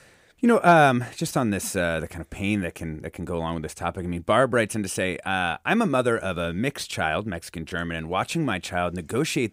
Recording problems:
none

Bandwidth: 15.5 kHz